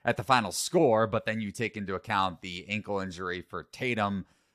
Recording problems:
none

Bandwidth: 15 kHz